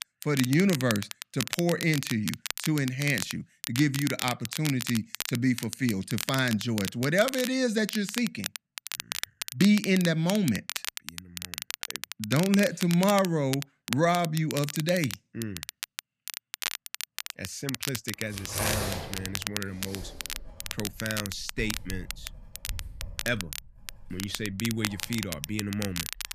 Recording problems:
crackle, like an old record; loud; 7 dB below the speech
household noises; noticeable; from 18 s on; 10 dB below the speech

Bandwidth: 14.5 kHz